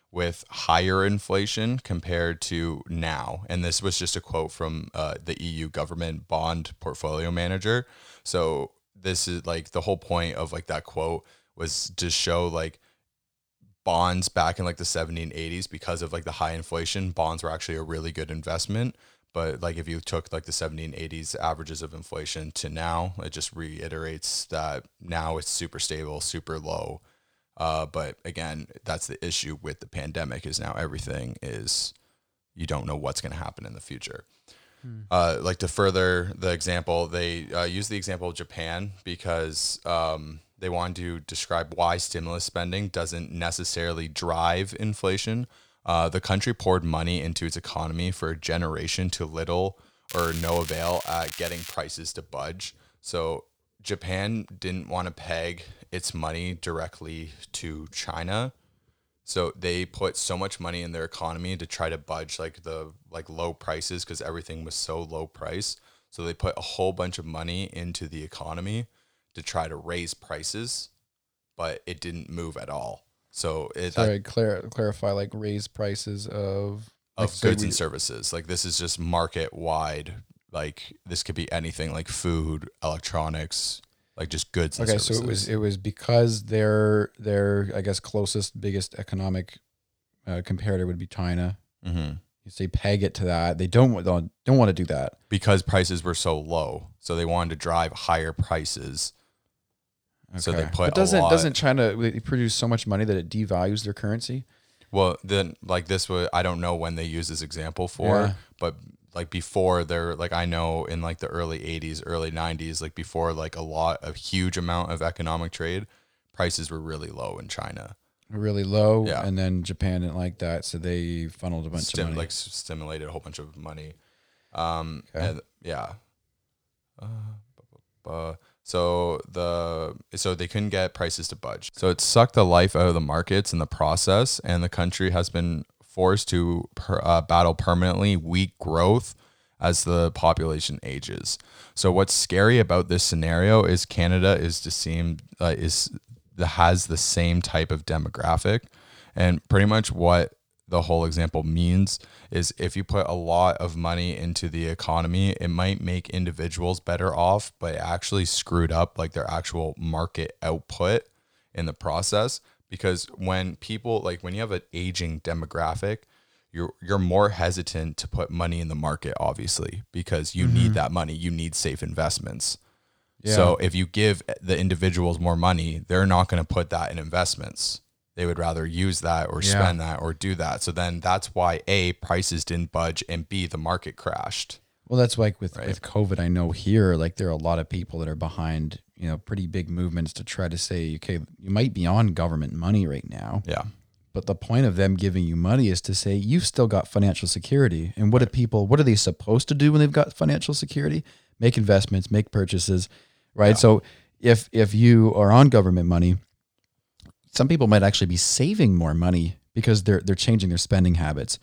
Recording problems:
crackling; noticeable; from 50 to 52 s; 10 dB below the speech

